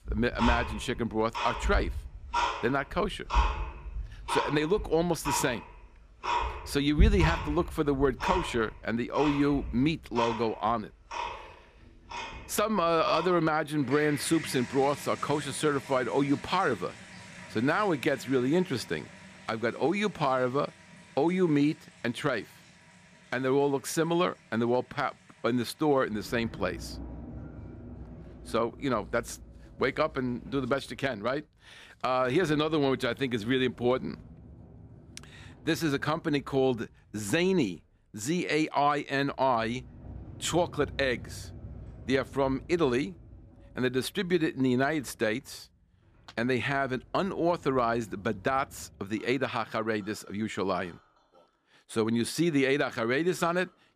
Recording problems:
household noises; loud; throughout; 8 dB below the speech

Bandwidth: 14.5 kHz